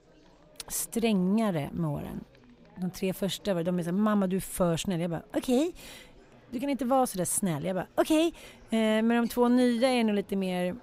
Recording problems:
chatter from many people; faint; throughout; 30 dB below the speech

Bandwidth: 15.5 kHz